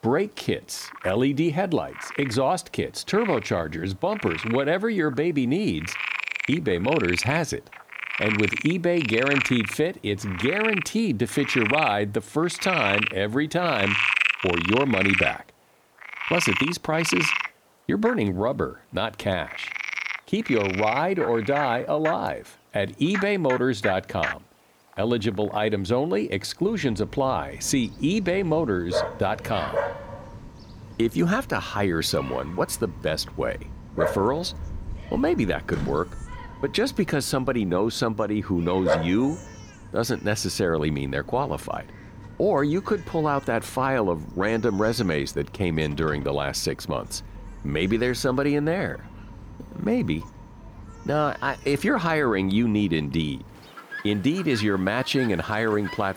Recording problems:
animal sounds; loud; throughout; 3 dB below the speech

